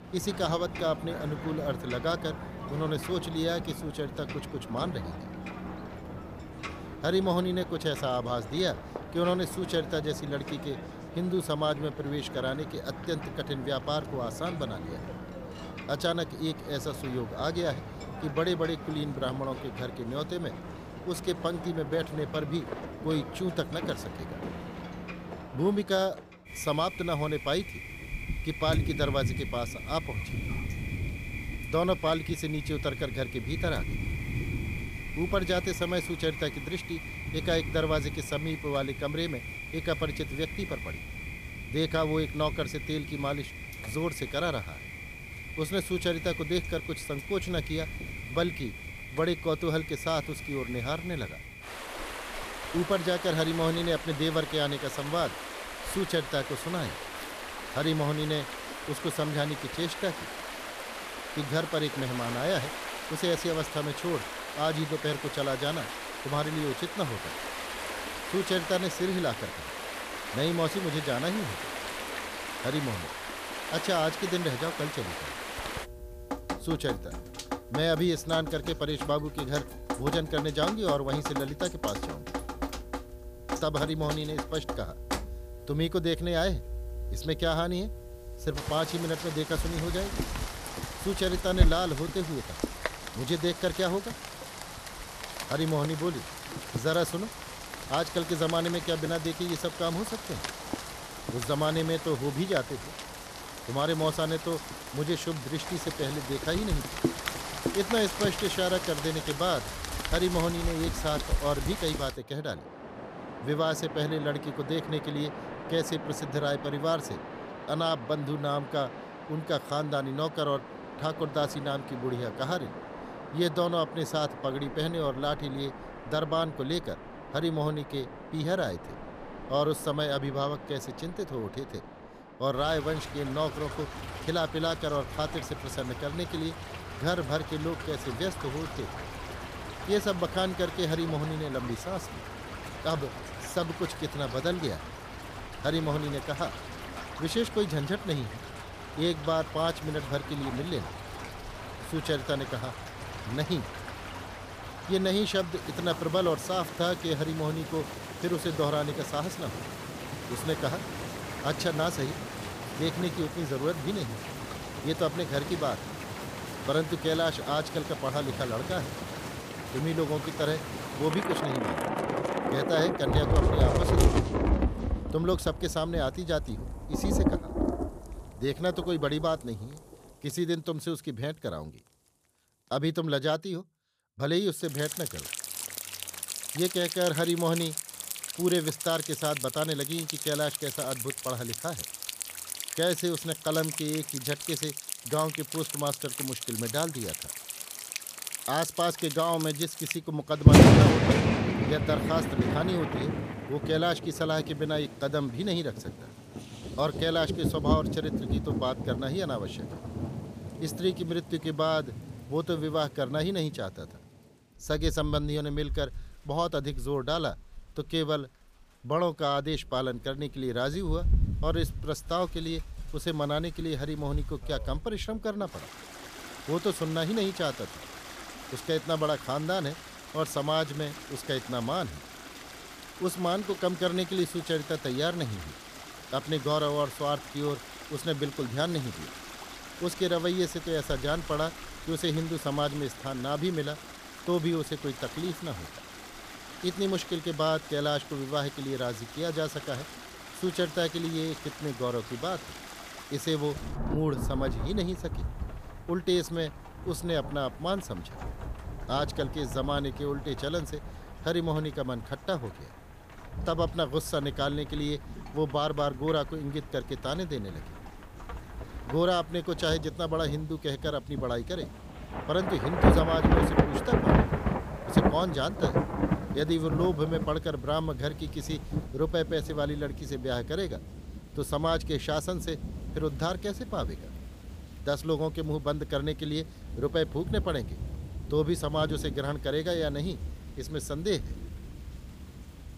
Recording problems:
rain or running water; loud; throughout; 4 dB below the speech

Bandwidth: 15 kHz